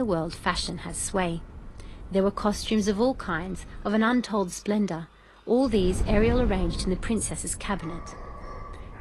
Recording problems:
garbled, watery; slightly; nothing above 11 kHz
wind noise on the microphone; occasional gusts; until 4 s and from 5.5 s on; 20 dB below the speech
animal sounds; faint; throughout; 25 dB below the speech
abrupt cut into speech; at the start

